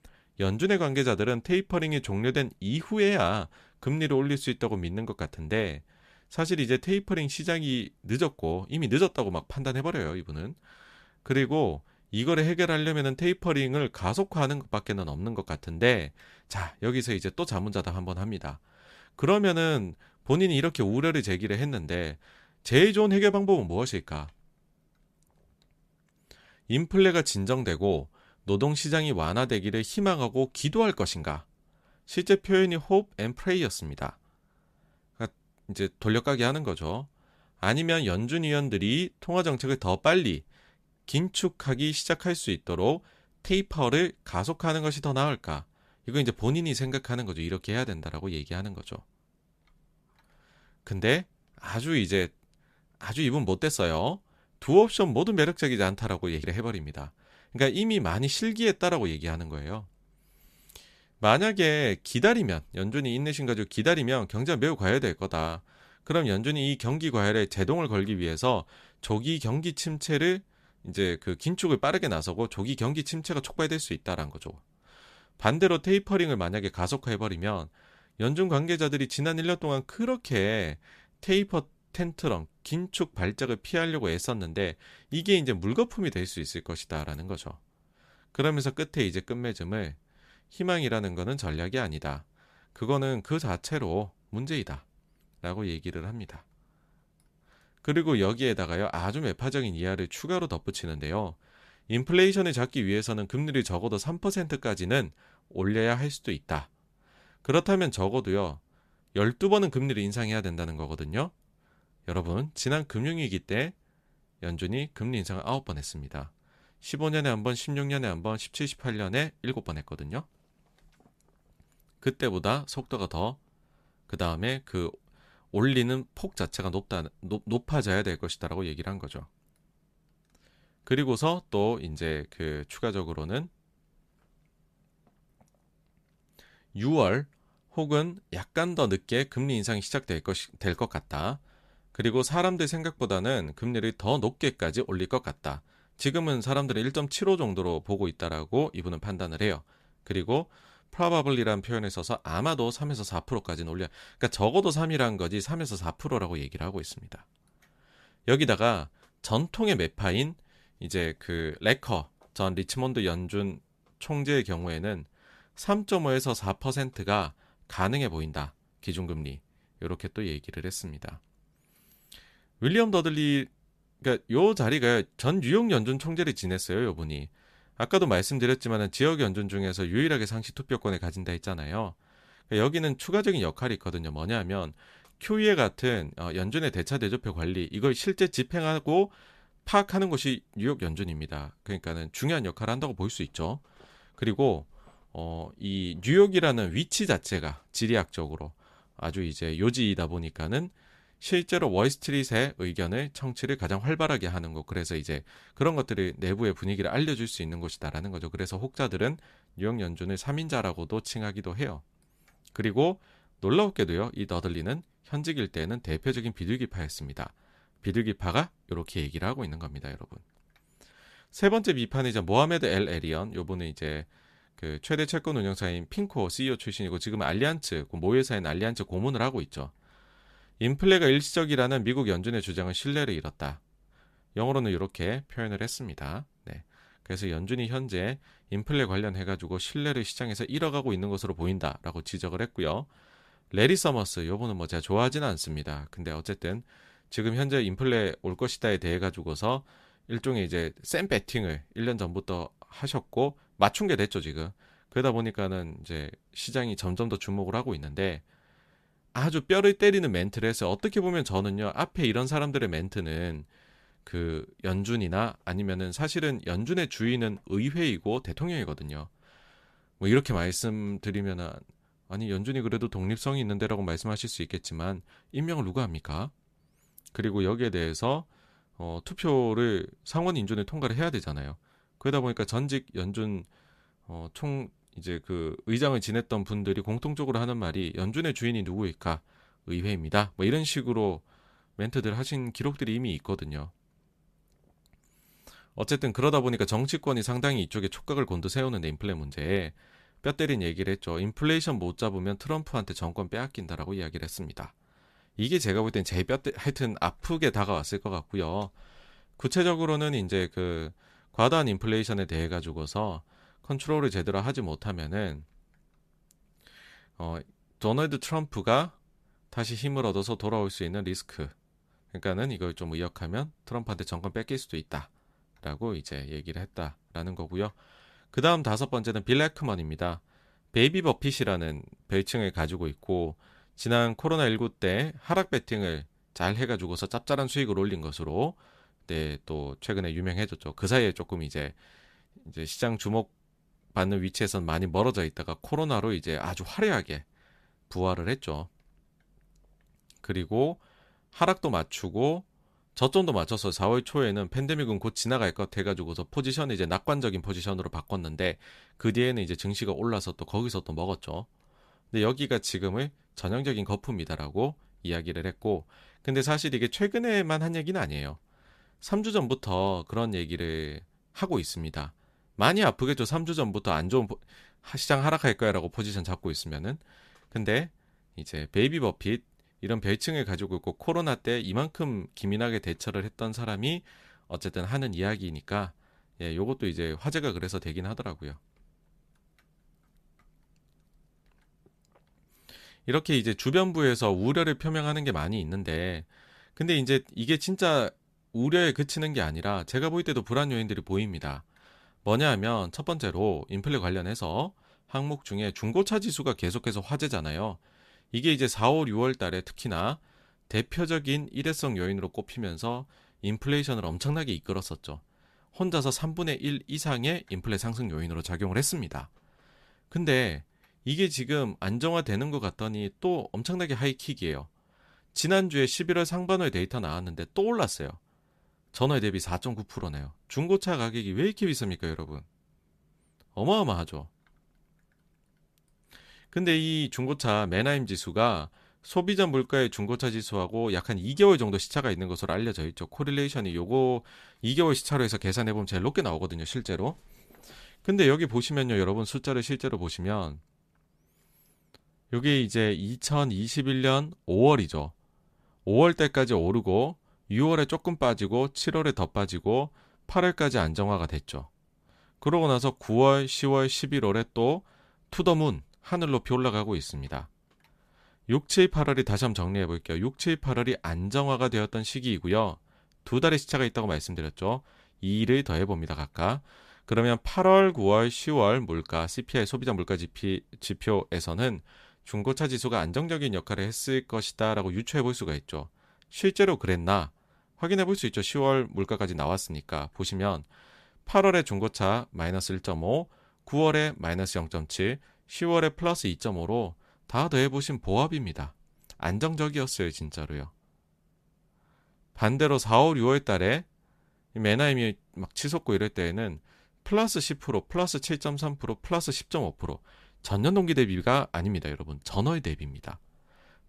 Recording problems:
none

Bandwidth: 14.5 kHz